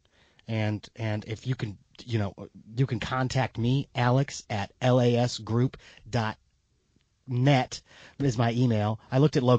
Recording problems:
garbled, watery; slightly
abrupt cut into speech; at the end

